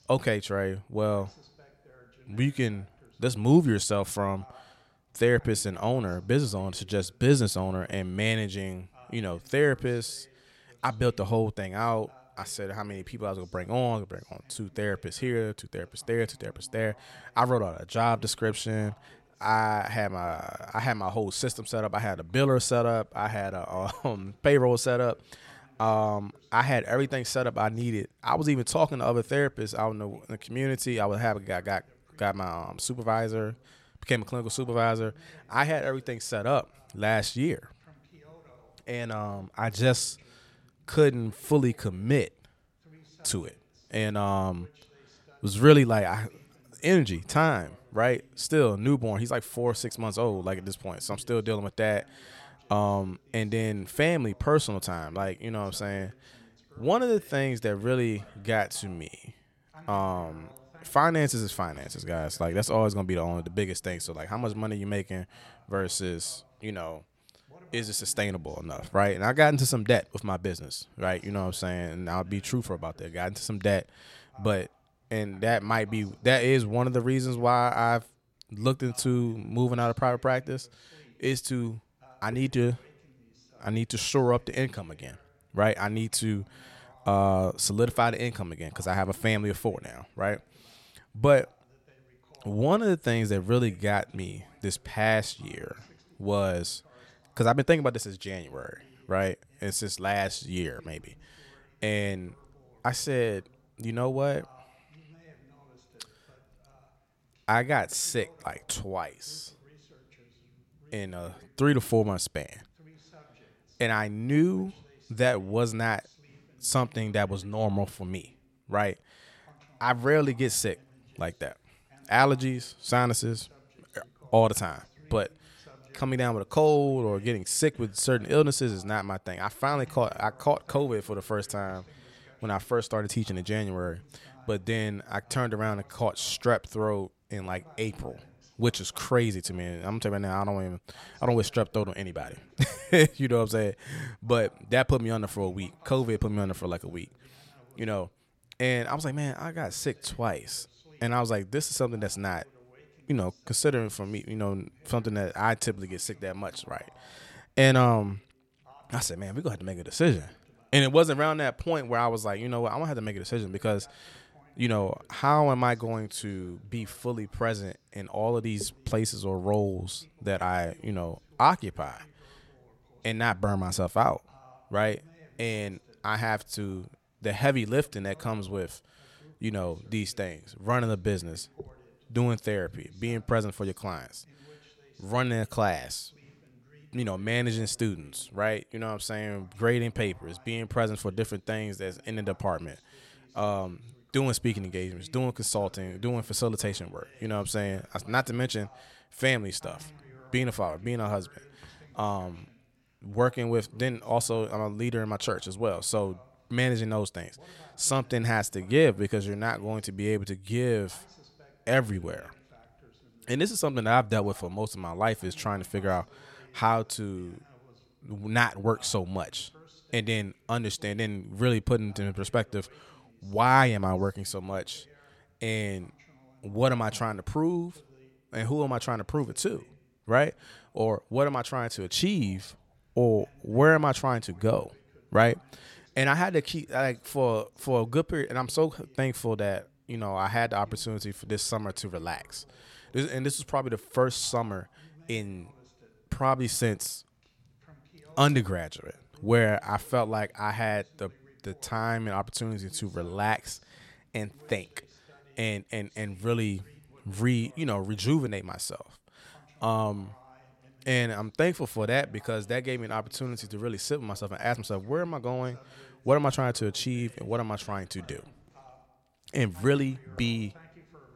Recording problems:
voice in the background; faint; throughout; 30 dB below the speech

